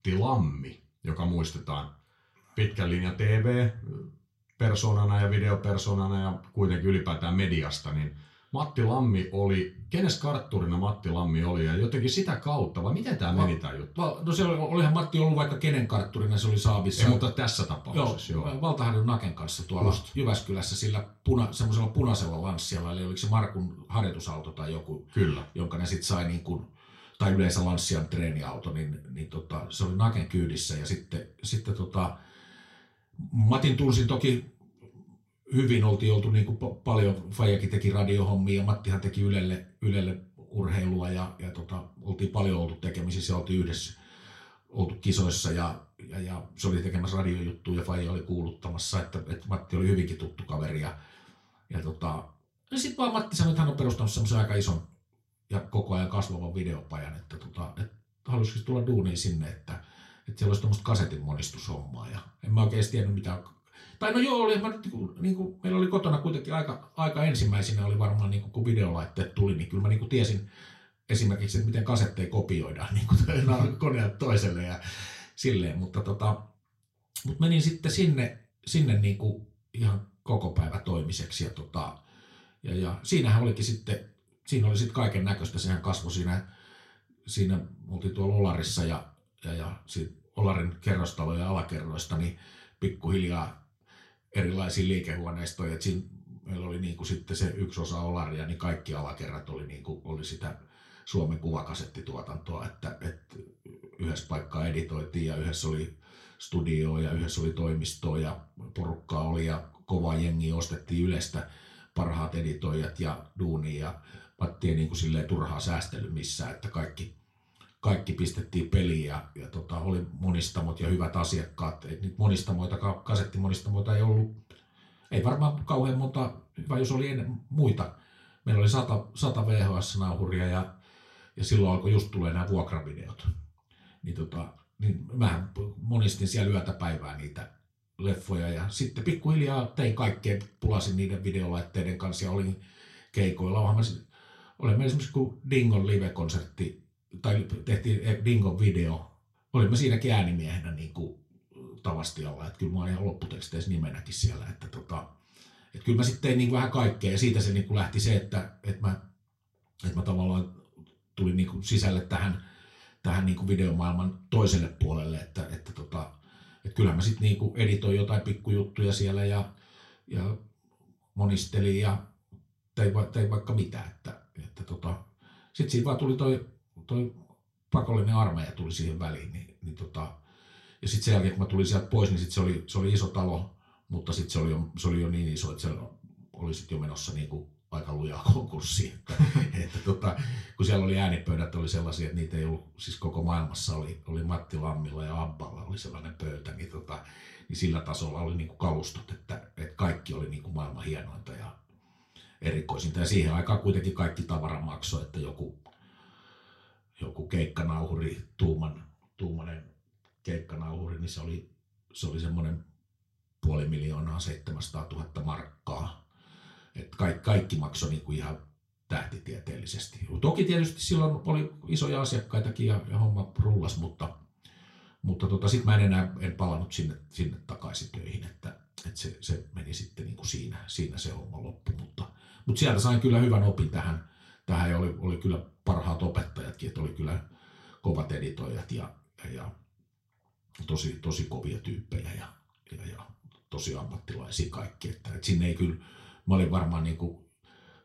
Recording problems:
off-mic speech; far
room echo; very slight; dies away in 0.3 s

